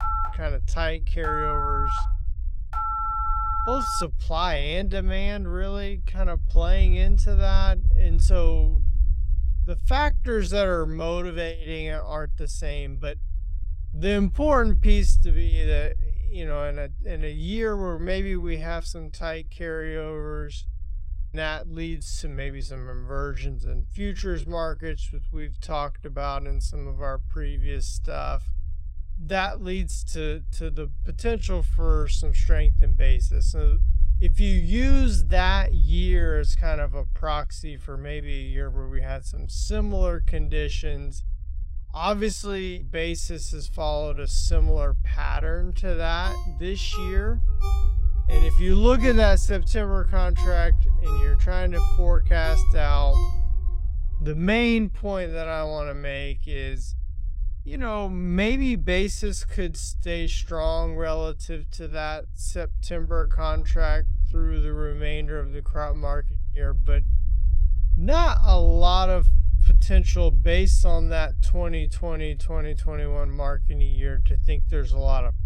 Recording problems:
wrong speed, natural pitch; too slow; 0.6 times normal speed
low rumble; noticeable; throughout; 20 dB below the speech
phone ringing; loud; until 4 s; peak 4 dB above the speech
phone ringing; noticeable; from 46 to 54 s; peak 9 dB below the speech

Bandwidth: 16 kHz